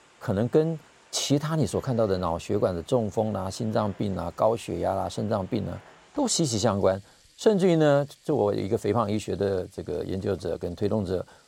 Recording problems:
household noises; faint; throughout; 30 dB below the speech

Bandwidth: 16 kHz